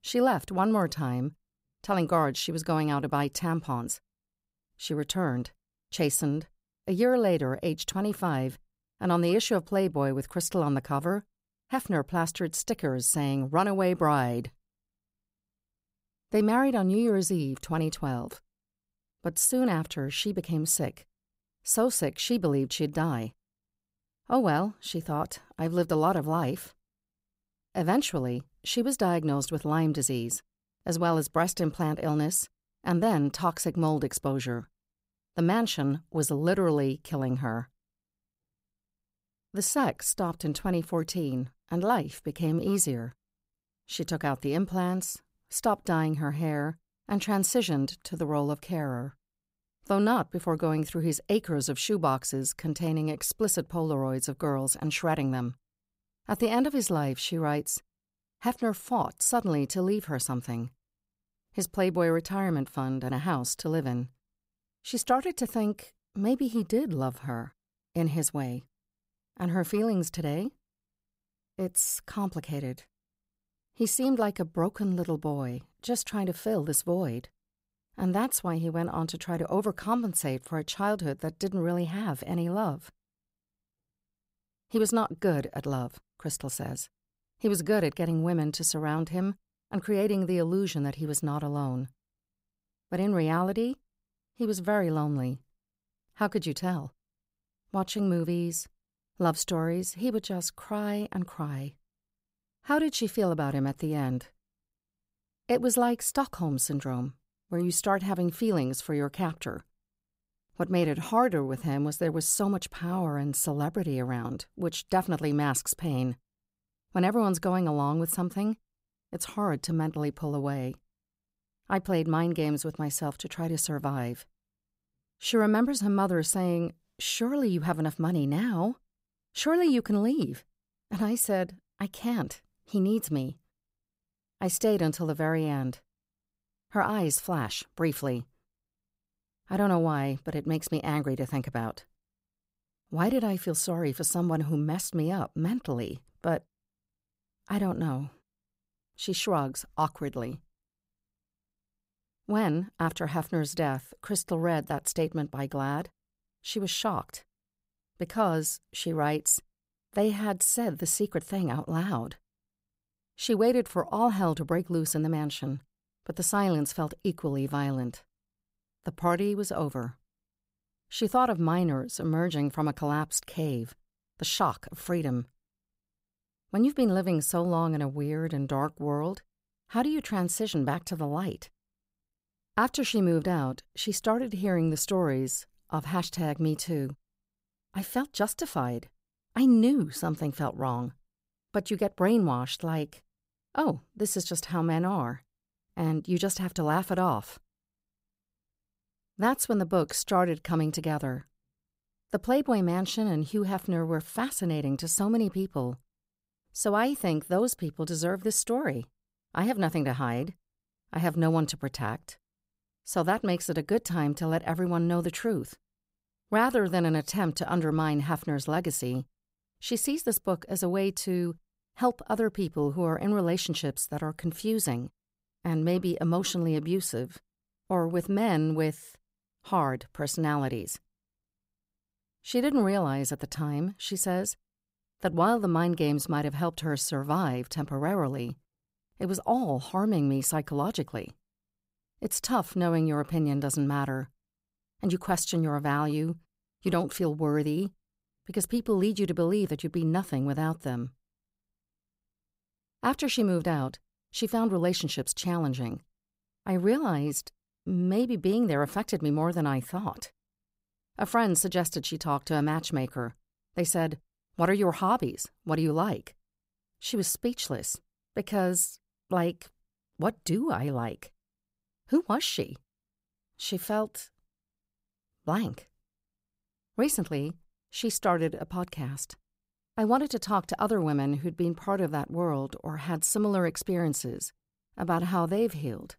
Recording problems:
none

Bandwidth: 15.5 kHz